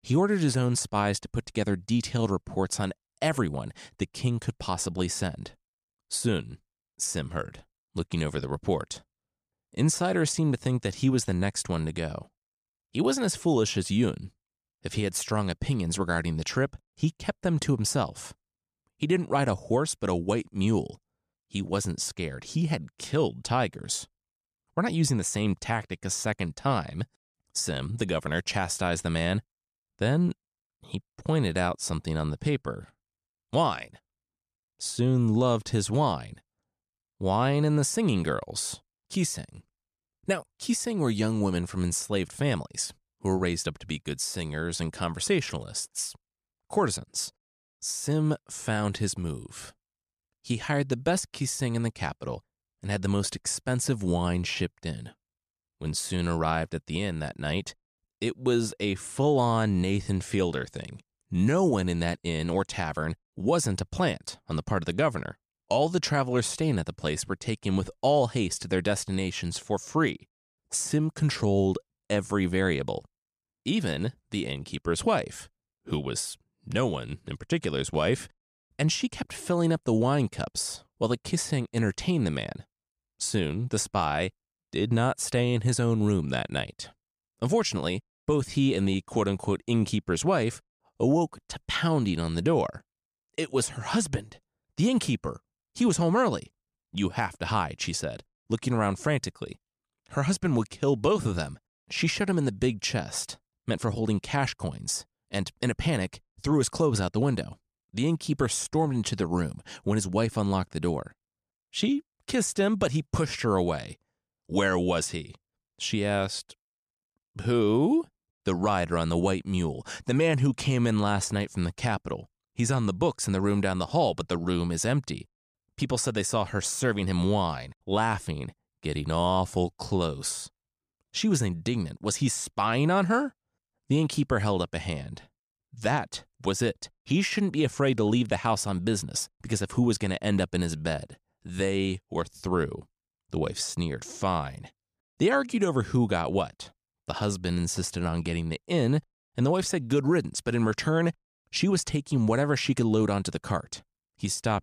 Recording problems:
none

